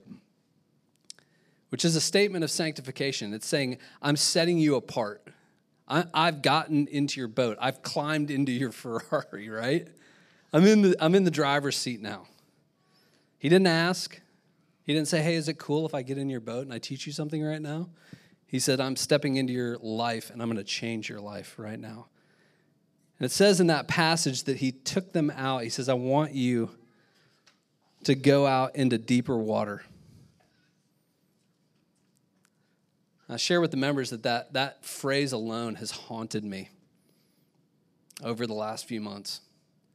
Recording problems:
none

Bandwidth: 14.5 kHz